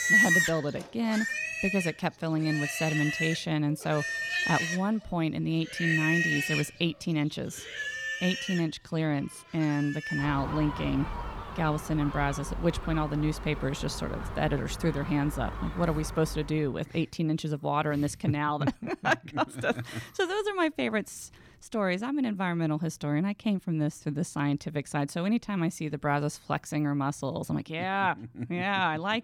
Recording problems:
animal sounds; loud; until 16 s; 2 dB below the speech

